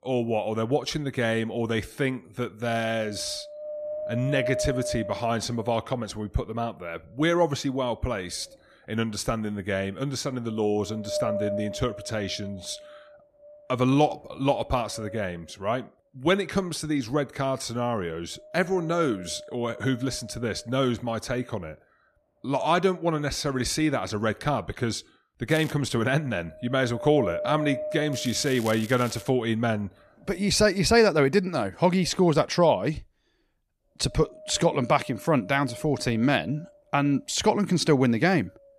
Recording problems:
wind noise on the microphone; heavy; 9 dB below the speech
crackling; noticeable; at 26 s and from 28 to 29 s; 15 dB below the speech

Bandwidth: 14.5 kHz